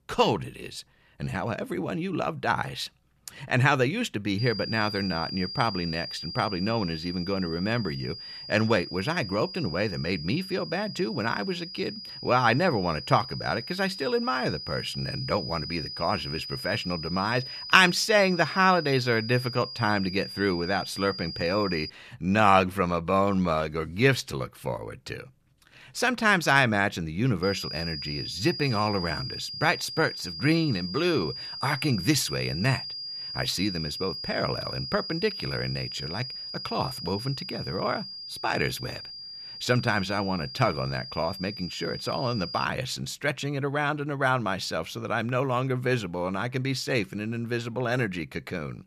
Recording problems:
high-pitched whine; loud; from 4.5 to 22 s and from 27 to 43 s; 5 kHz, 8 dB below the speech

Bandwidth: 14.5 kHz